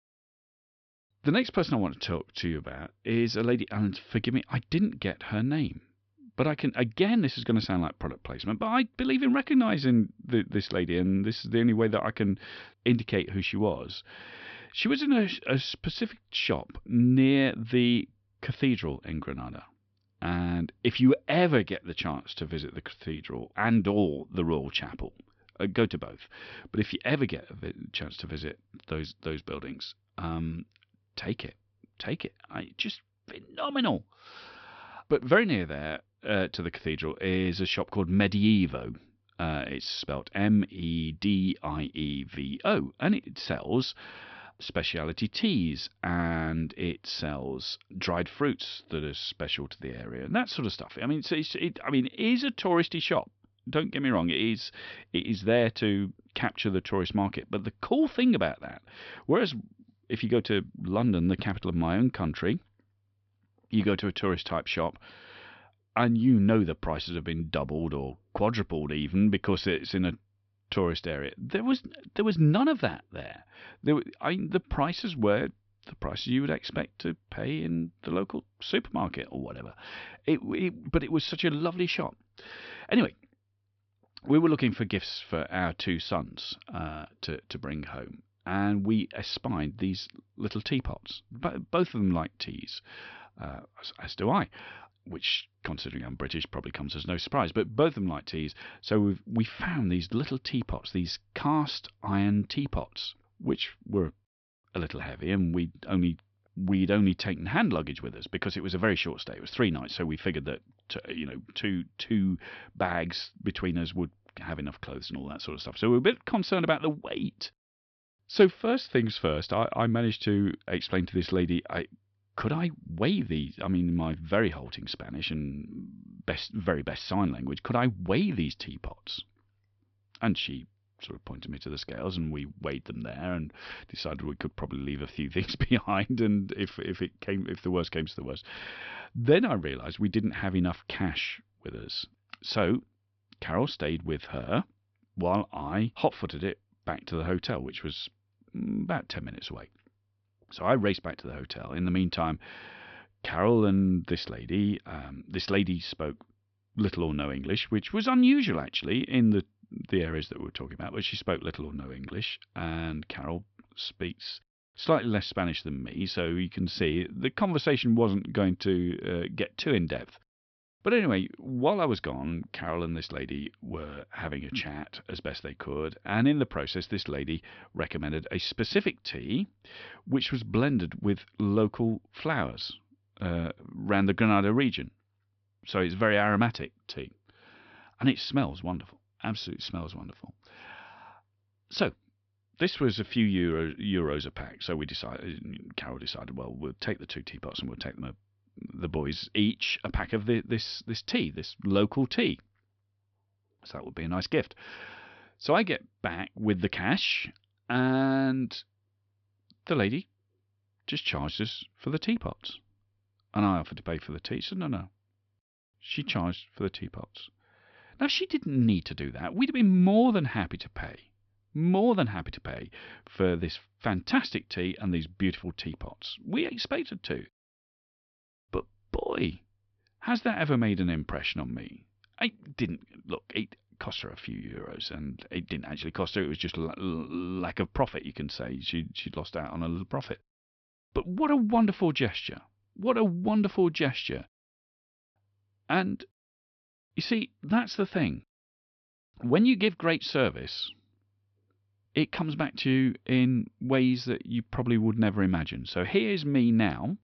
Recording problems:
high frequencies cut off; noticeable; nothing above 5.5 kHz

